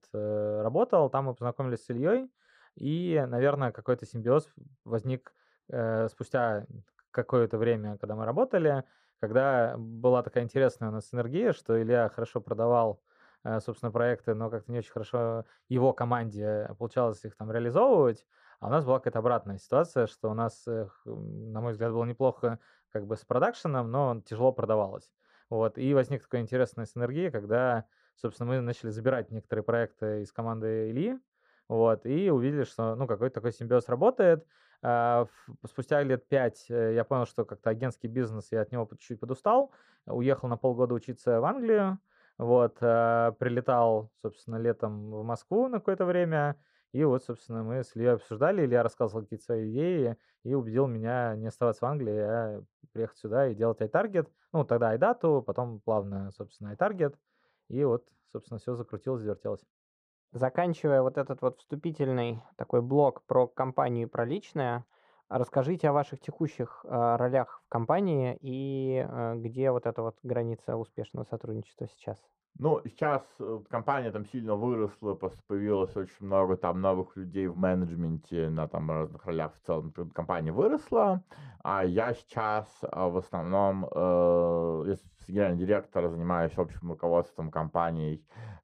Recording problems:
muffled; very; fading above 2 kHz

